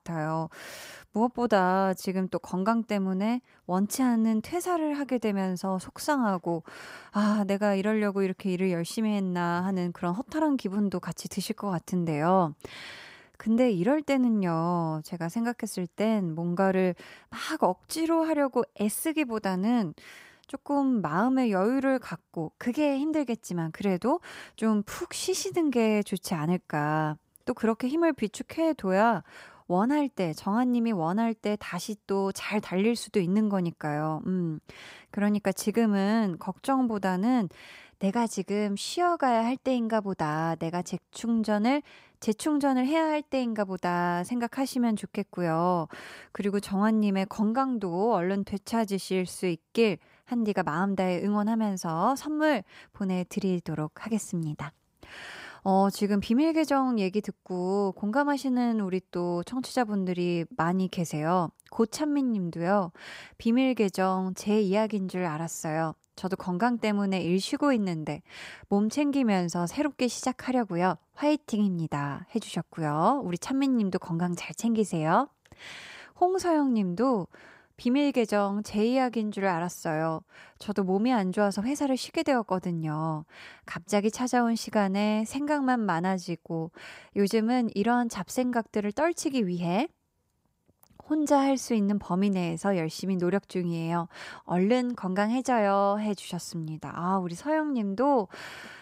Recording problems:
none

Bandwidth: 15.5 kHz